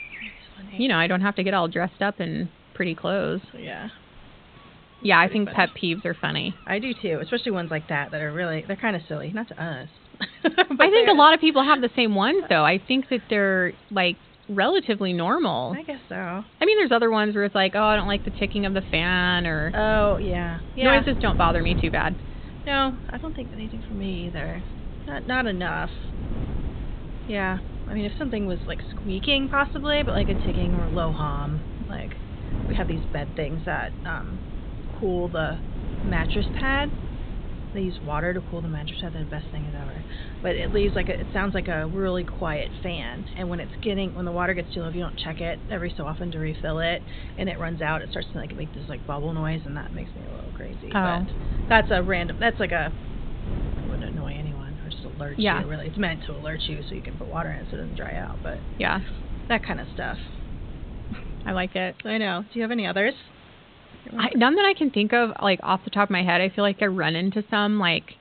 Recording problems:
high frequencies cut off; severe; nothing above 4 kHz
wind noise on the microphone; occasional gusts; from 18 s to 1:02; 20 dB below the speech
animal sounds; faint; until 22 s; 30 dB below the speech
hiss; faint; throughout; 25 dB below the speech

